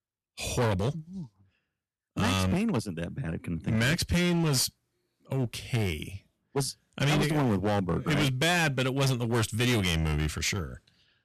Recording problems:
distortion; heavy; 13% of the sound clipped

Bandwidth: 13.5 kHz